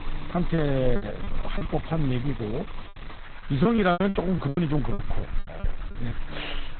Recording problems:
garbled, watery; badly; nothing above 4 kHz
traffic noise; noticeable; throughout; 20 dB below the speech
electrical hum; faint; throughout; 60 Hz, 20 dB below the speech
hiss; faint; throughout; 25 dB below the speech
choppy; very; 12% of the speech affected

